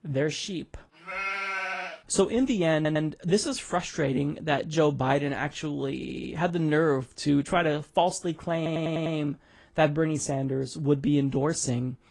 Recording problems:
garbled, watery; slightly
audio stuttering; at 3 s, at 6 s and at 8.5 s

